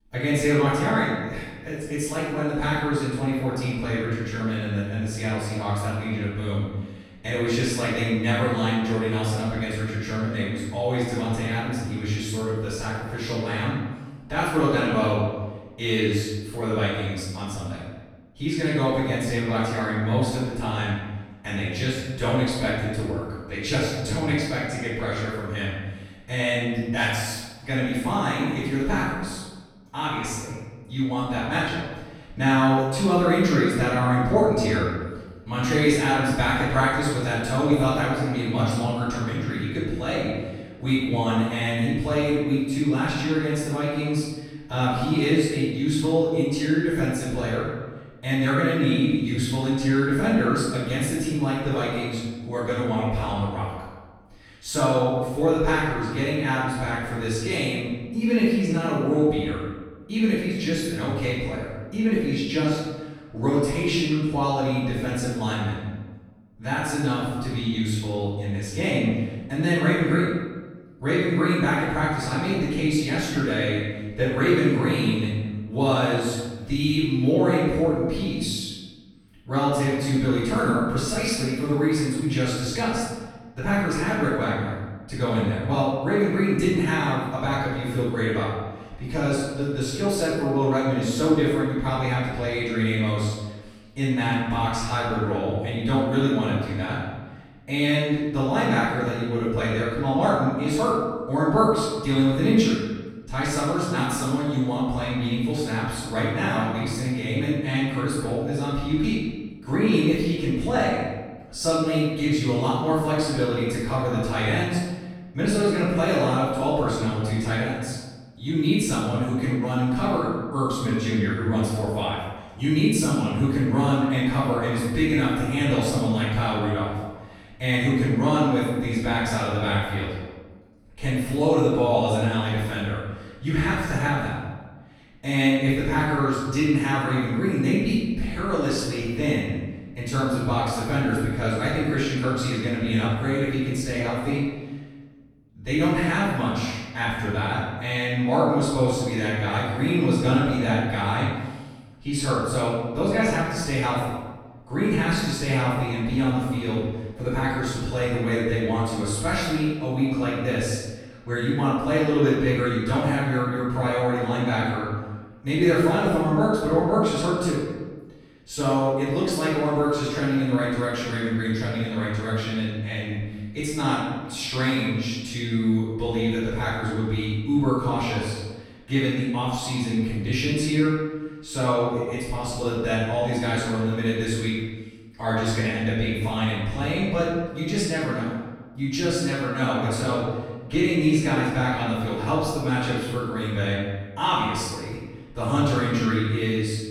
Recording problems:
room echo; strong; dies away in 1.1 s
off-mic speech; far

